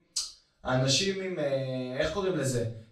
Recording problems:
off-mic speech; far
room echo; slight; dies away in 0.4 s

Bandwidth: 15 kHz